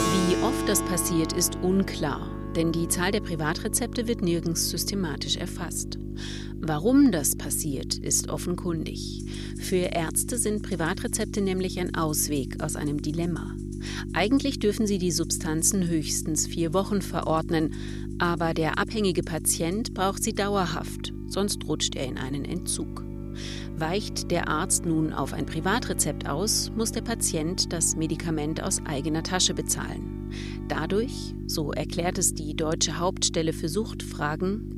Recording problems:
electrical hum; noticeable; throughout; 50 Hz, 15 dB below the speech
background music; noticeable; throughout; 15 dB below the speech

